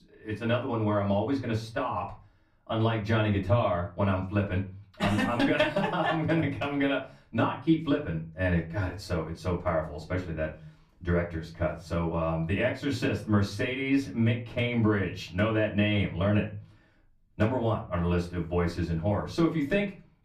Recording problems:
off-mic speech; far
room echo; very slight; dies away in 0.3 s

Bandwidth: 15 kHz